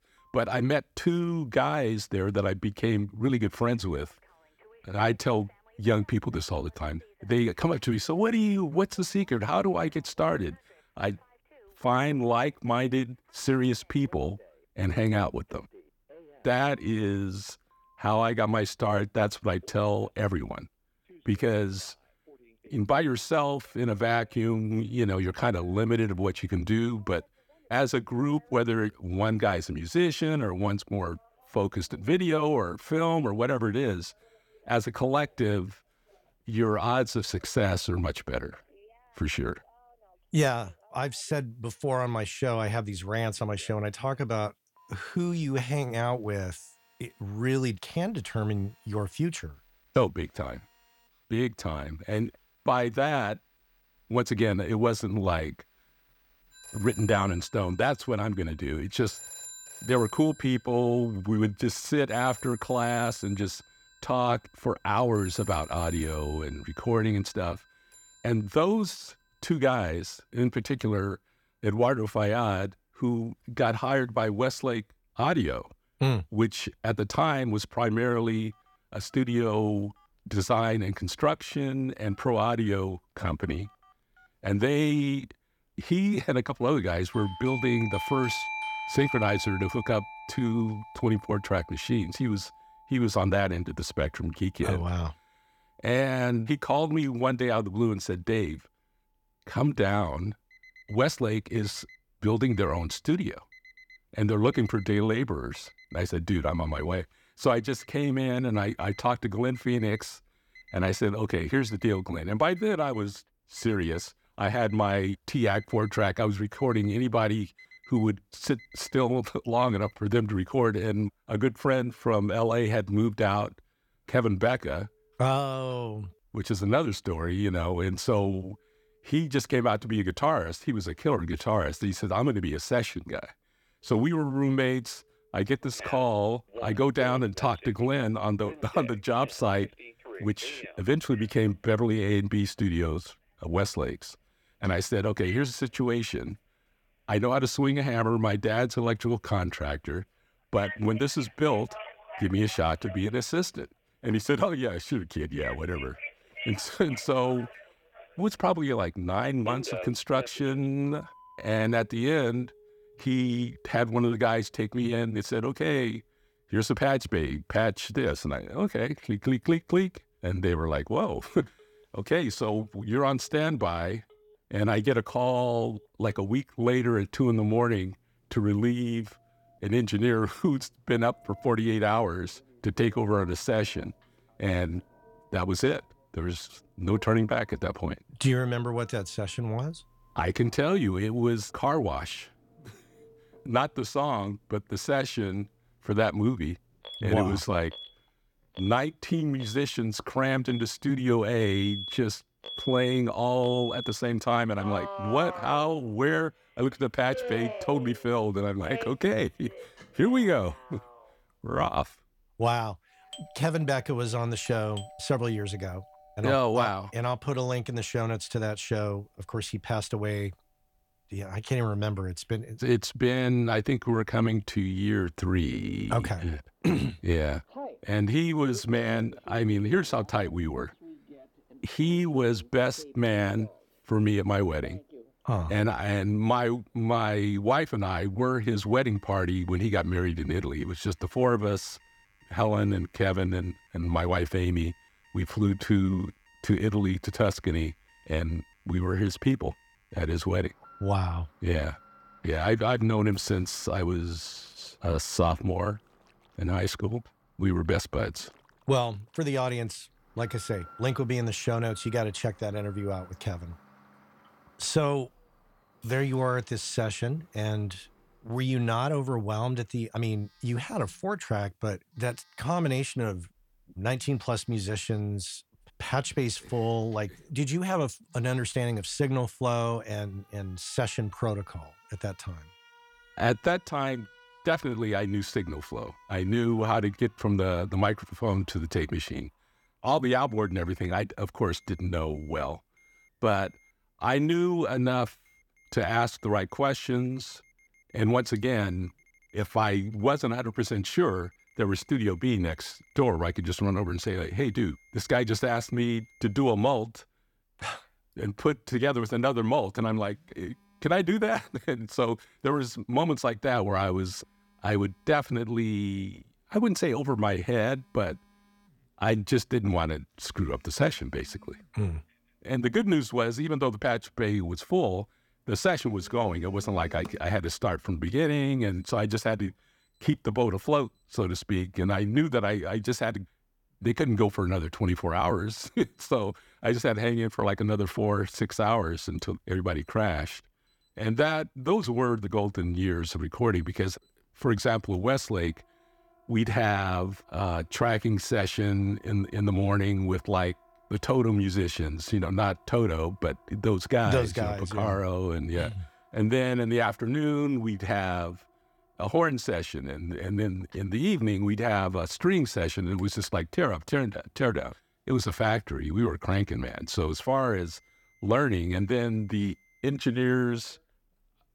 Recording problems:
alarms or sirens; noticeable; throughout; 15 dB below the speech

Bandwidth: 17.5 kHz